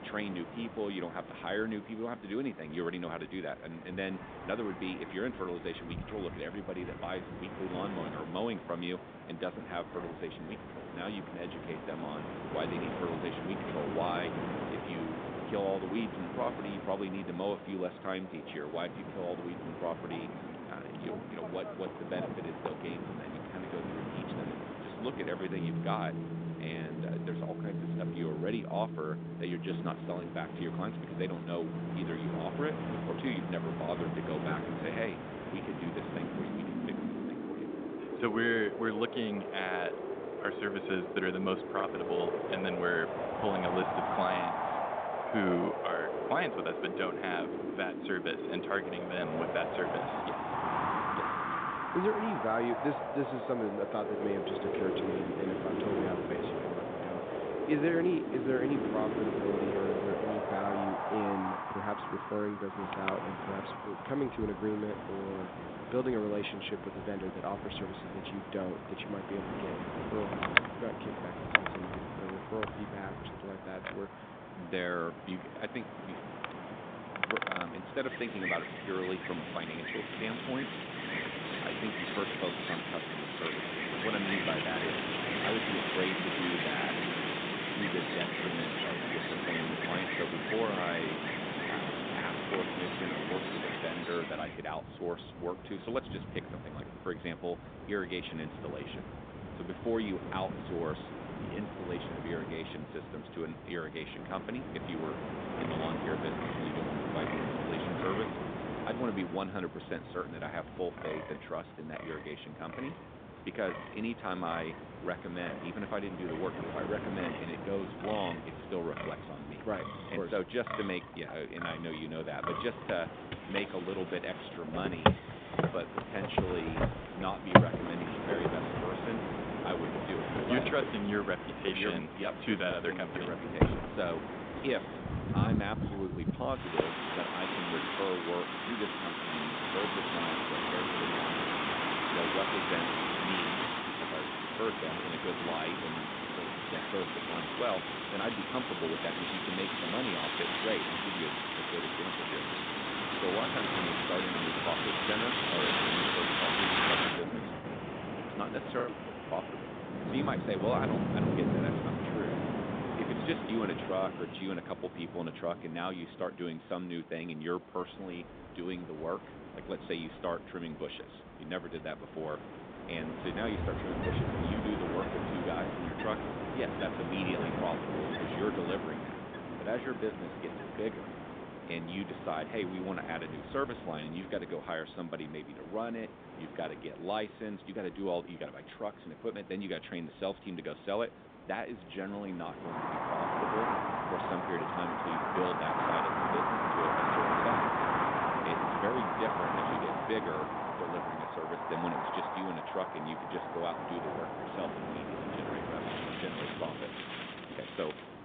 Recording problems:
phone-call audio; nothing above 3.5 kHz
wind in the background; very loud; throughout; 2 dB above the speech
choppy; occasionally; at 41 s and at 2:39; 4% of the speech affected

